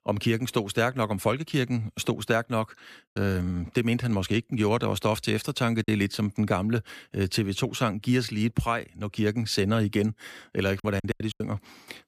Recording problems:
choppy; very; at 6 s and at 11 s; 5% of the speech affected

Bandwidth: 14.5 kHz